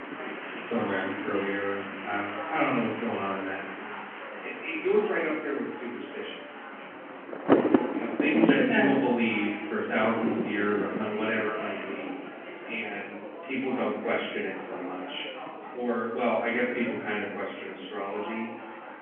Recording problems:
off-mic speech; far
room echo; noticeable; dies away in 0.7 s
phone-call audio
wind noise on the microphone; heavy; 3 dB below the speech
murmuring crowd; loud; throughout; 10 dB below the speech
animal sounds; faint; until 5.5 s; 25 dB below the speech

